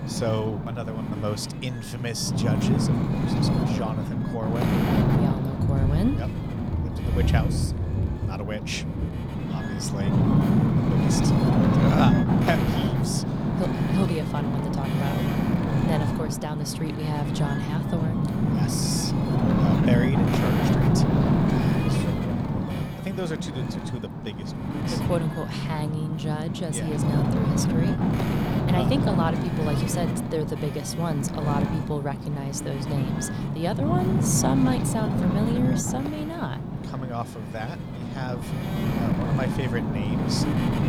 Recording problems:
rain or running water; very loud; throughout; 1 dB above the speech
wind noise on the microphone; heavy; 1 dB above the speech

